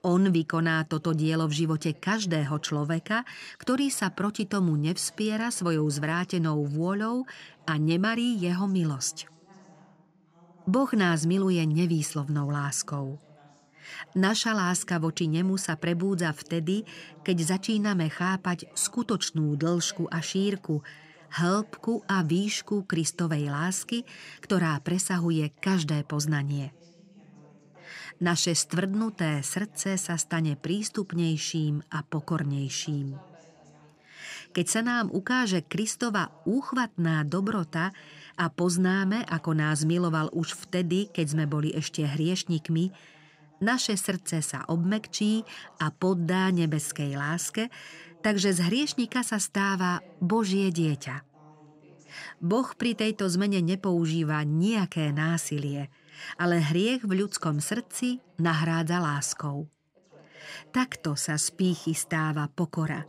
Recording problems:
background chatter; faint; throughout; 2 voices, 30 dB below the speech

